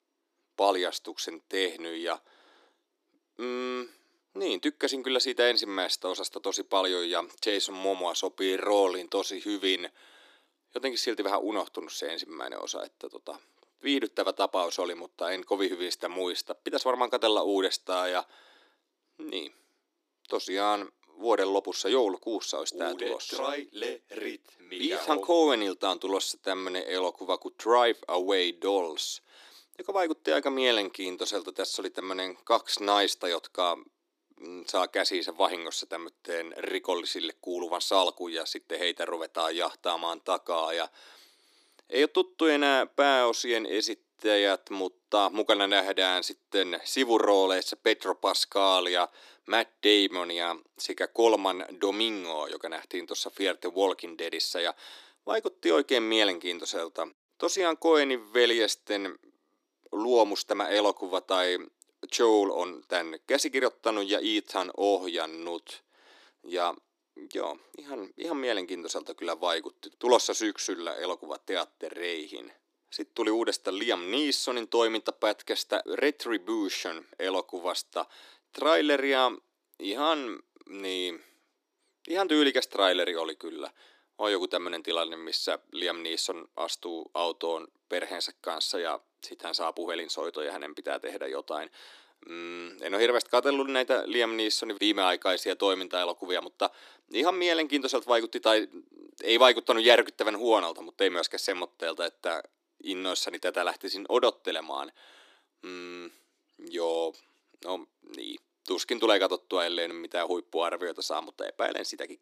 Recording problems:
thin; somewhat; fading below 300 Hz

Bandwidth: 14.5 kHz